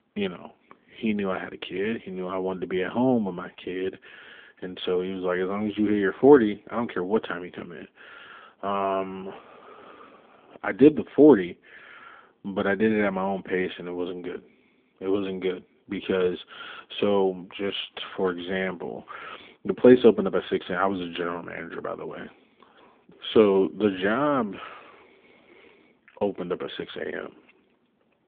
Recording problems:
phone-call audio; nothing above 3.5 kHz

